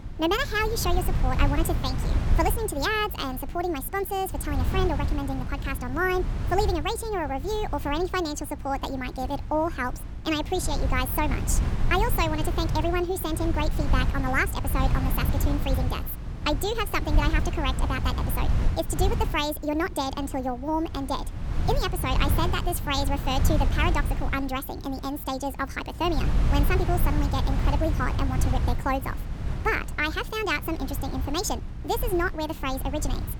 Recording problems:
wrong speed and pitch; too fast and too high; 1.5 times normal speed
wind noise on the microphone; occasional gusts; 10 dB below the speech
electrical hum; faint; throughout; 60 Hz, 30 dB below the speech

